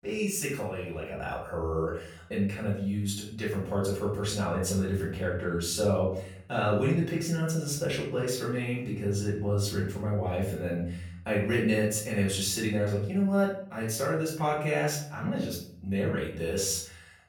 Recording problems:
off-mic speech; far
room echo; noticeable; dies away in 0.6 s

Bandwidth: 19 kHz